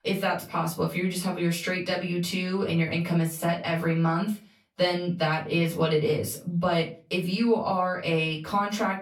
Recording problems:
off-mic speech; far
room echo; very slight; dies away in 0.3 s

